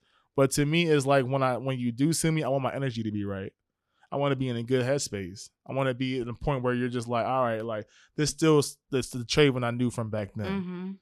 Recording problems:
none

